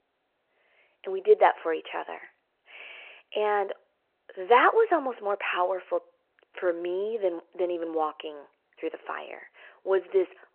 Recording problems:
phone-call audio

